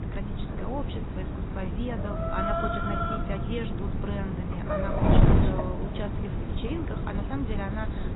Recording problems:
garbled, watery; badly; nothing above 4 kHz
animal sounds; very loud; throughout; 1 dB above the speech
wind noise on the microphone; heavy; 1 dB above the speech

